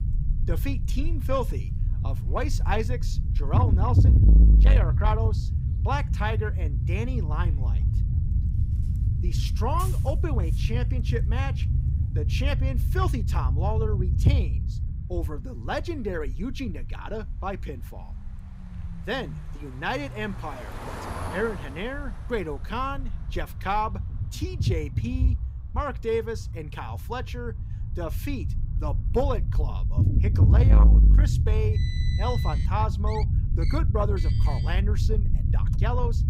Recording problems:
distortion; slight; 10 dB below the speech
low rumble; loud; throughout; 8 dB below the speech
traffic noise; noticeable; throughout; 10 dB below the speech

